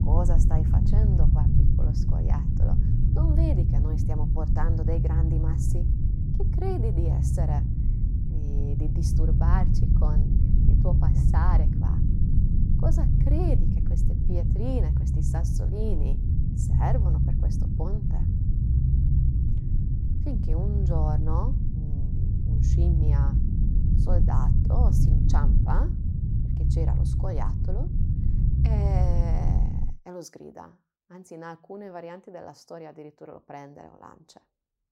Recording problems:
low rumble; loud; until 30 s; as loud as the speech

